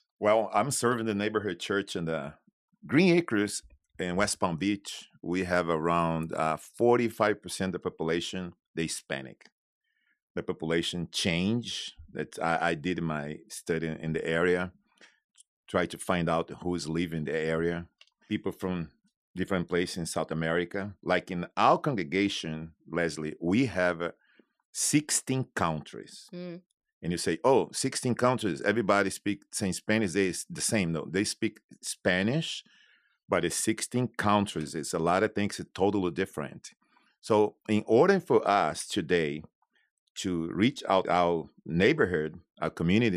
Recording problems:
abrupt cut into speech; at the end

